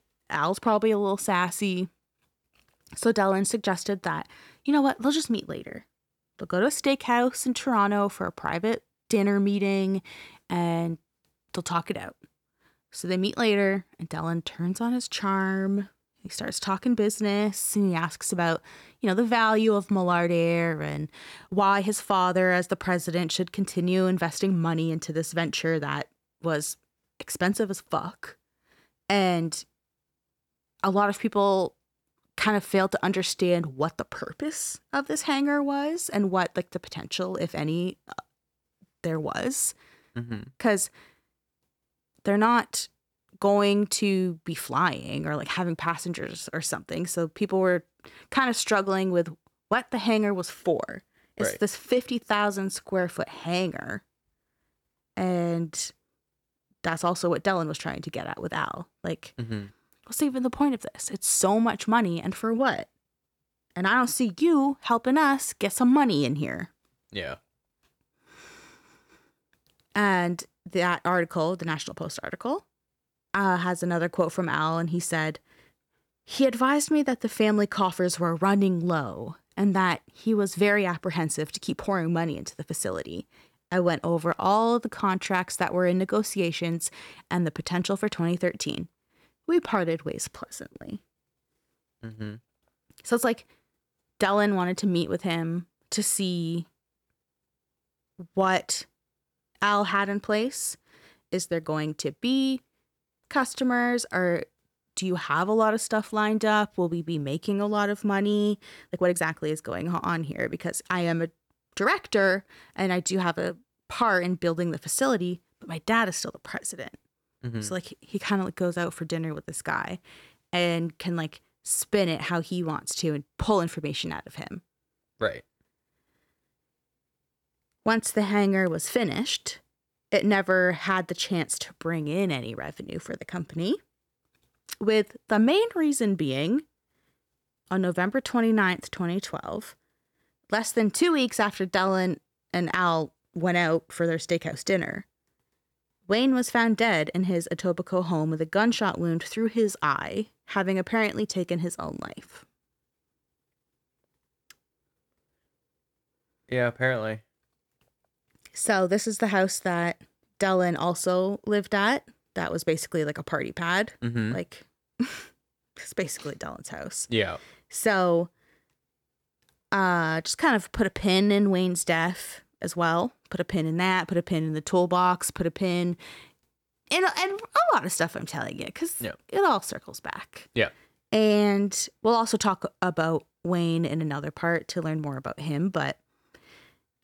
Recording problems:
uneven, jittery; strongly; from 21 s to 1:49

